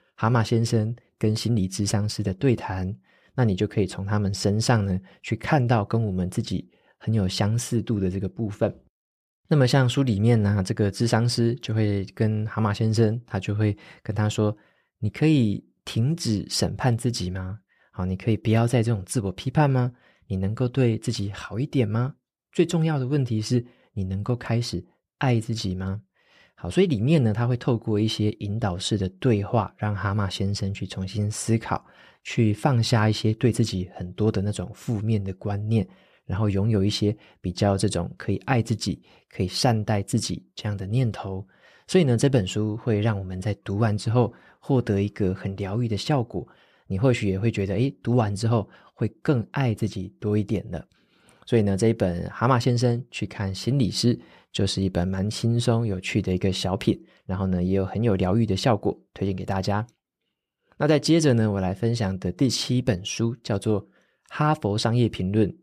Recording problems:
none

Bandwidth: 14.5 kHz